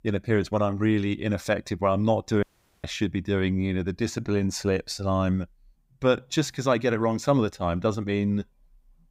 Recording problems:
audio cutting out; at 2.5 s

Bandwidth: 15.5 kHz